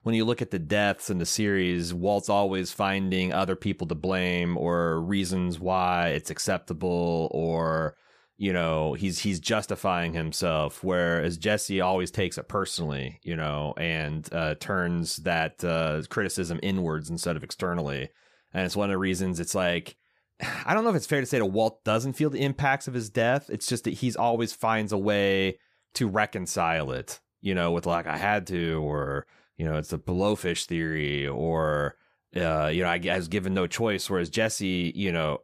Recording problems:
none

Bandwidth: 14.5 kHz